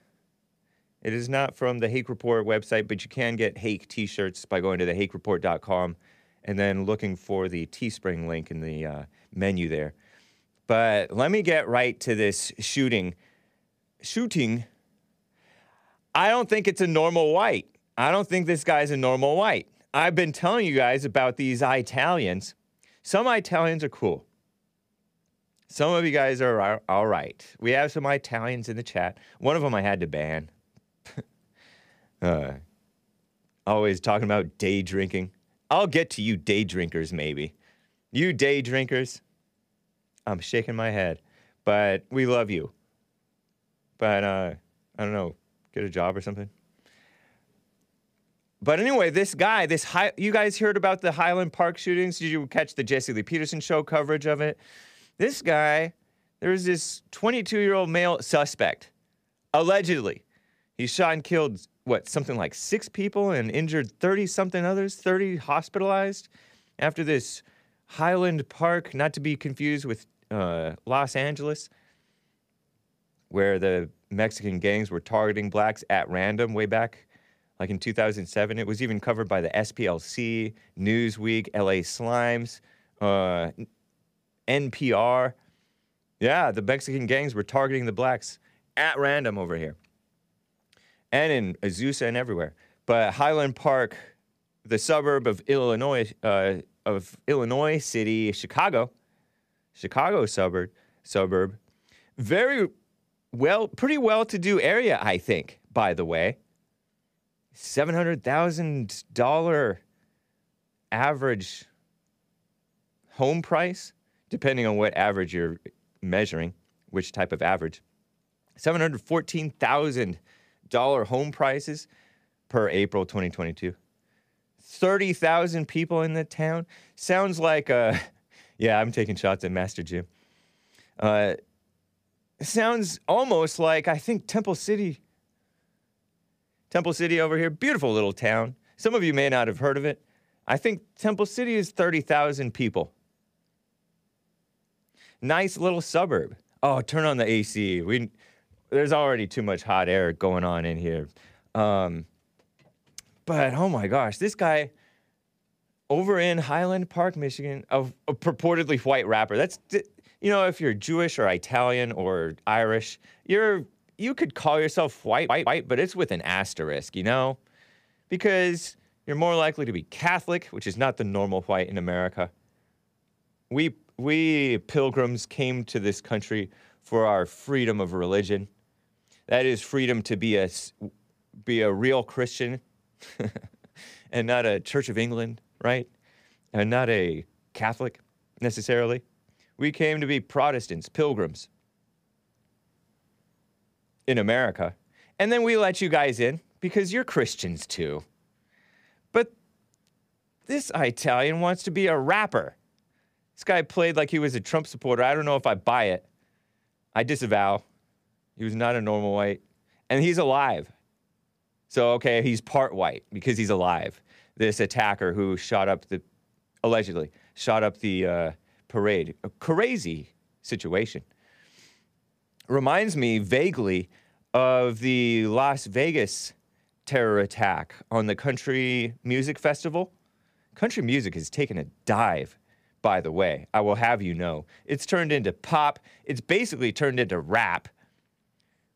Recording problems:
audio stuttering; at 2:45

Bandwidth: 15 kHz